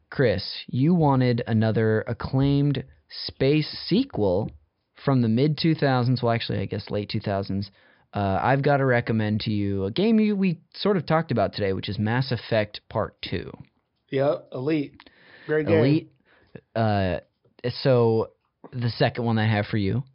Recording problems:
high frequencies cut off; noticeable; nothing above 5.5 kHz

